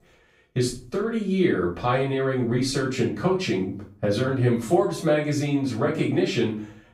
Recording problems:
off-mic speech; far
room echo; slight; dies away in 0.4 s

